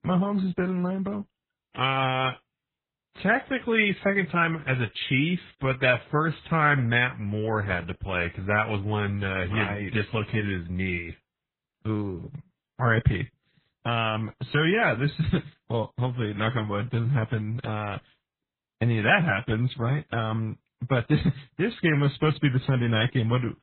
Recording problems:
garbled, watery; badly; nothing above 3.5 kHz

